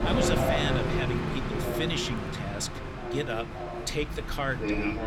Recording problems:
train or aircraft noise; very loud; throughout; 2 dB above the speech
crowd noise; faint; throughout; 25 dB below the speech

